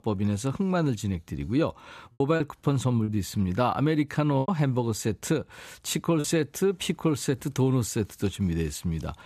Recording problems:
choppy; very; from 2 to 6 s; 7% of the speech affected

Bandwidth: 14.5 kHz